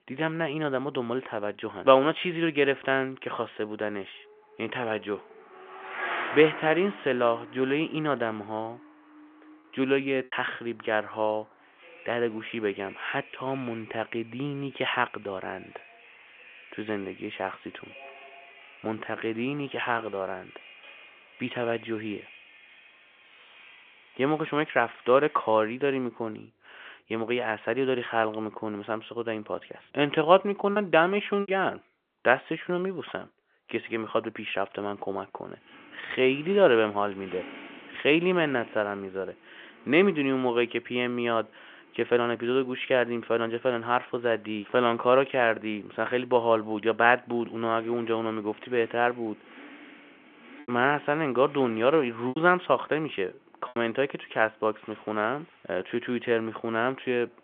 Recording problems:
phone-call audio; nothing above 3.5 kHz
traffic noise; noticeable; throughout; 20 dB below the speech
choppy; occasionally; at 10 s, at 31 s and from 51 to 54 s; 4% of the speech affected

